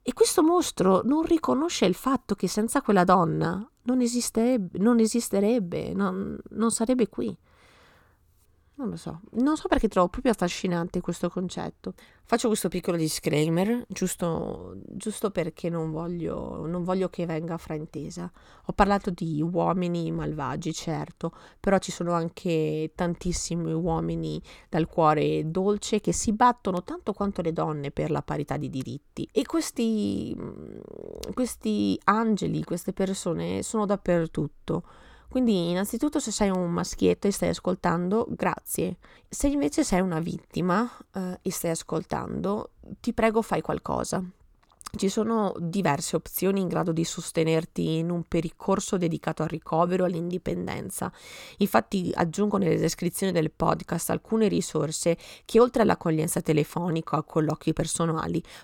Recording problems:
none

